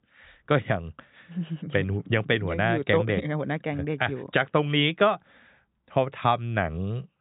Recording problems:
high frequencies cut off; severe; nothing above 4 kHz

